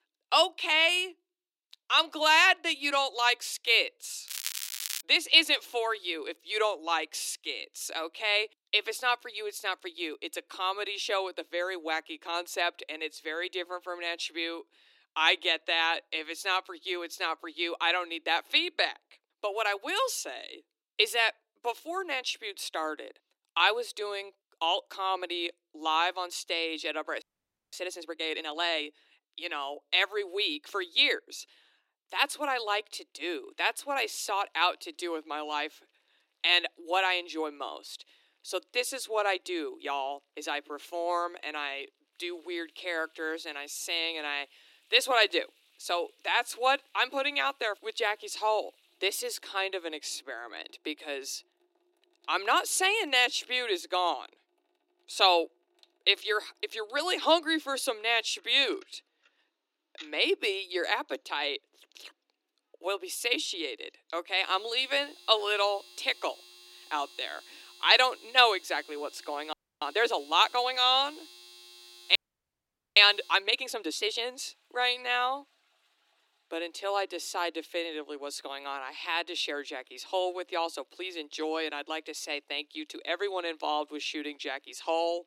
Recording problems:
thin; somewhat; fading below 300 Hz
crackling; loud; at 4.5 s, mostly in the pauses; 6 dB below the speech
household noises; faint; from 33 s on; 25 dB below the speech
audio freezing; at 27 s for 0.5 s, at 1:10 and at 1:12 for 1 s

